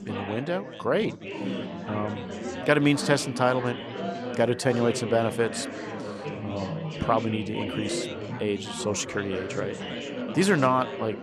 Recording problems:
chatter from many people; loud; throughout; 7 dB below the speech

